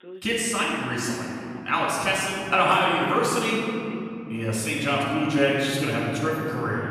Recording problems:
room echo; strong; dies away in 3 s
off-mic speech; far
voice in the background; faint; throughout; 25 dB below the speech

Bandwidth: 14.5 kHz